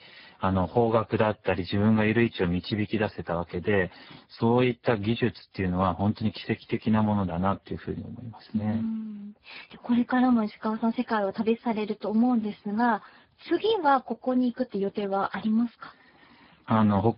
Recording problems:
garbled, watery; badly; nothing above 5 kHz

